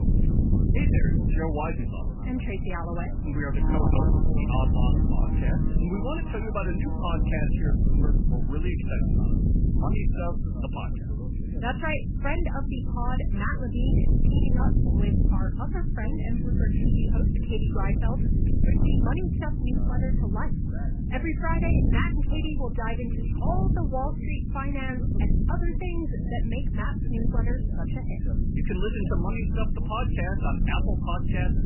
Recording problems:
garbled, watery; badly; nothing above 3 kHz
distortion; slight; 10 dB below the speech
animal sounds; loud; until 9 s; 7 dB below the speech
low rumble; loud; throughout; 4 dB below the speech
voice in the background; noticeable; throughout; 15 dB below the speech

